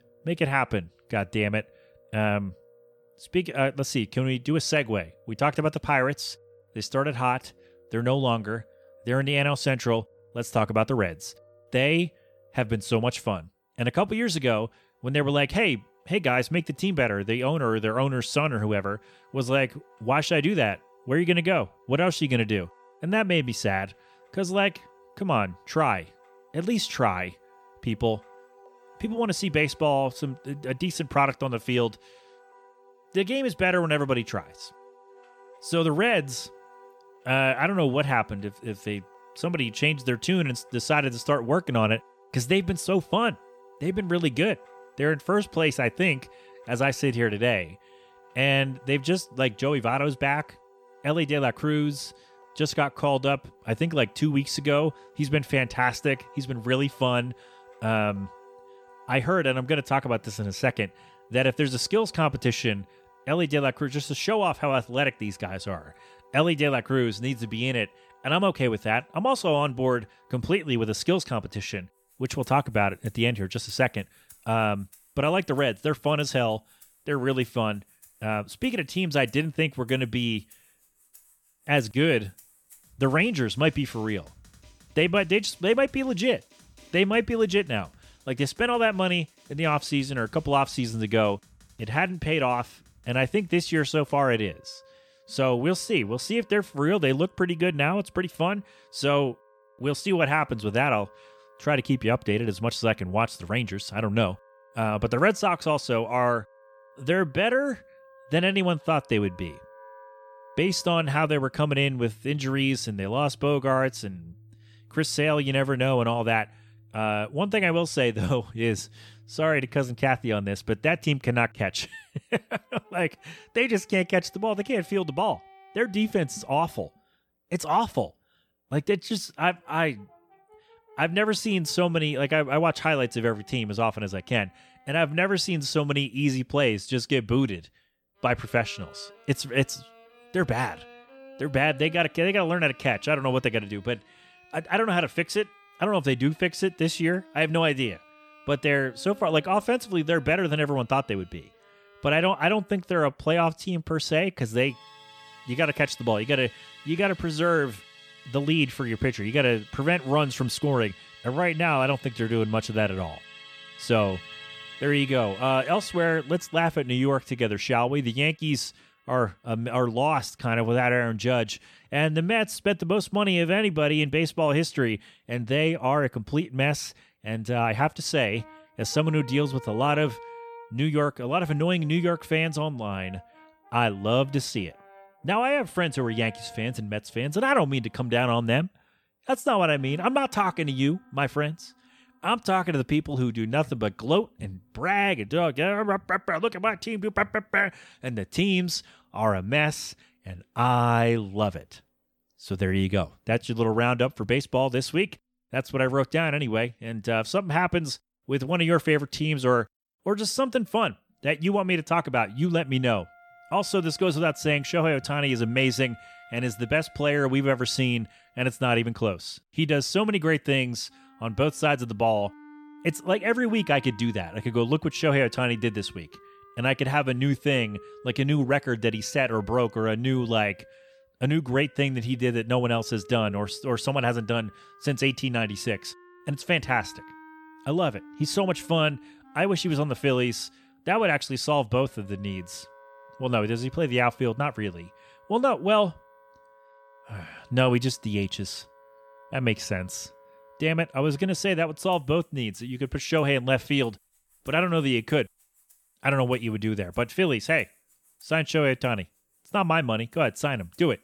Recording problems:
background music; faint; throughout; 25 dB below the speech

